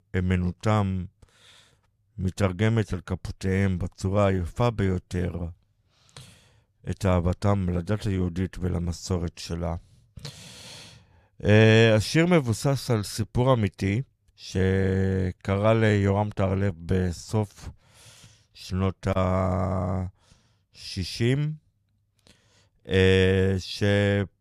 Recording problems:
none

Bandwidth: 14.5 kHz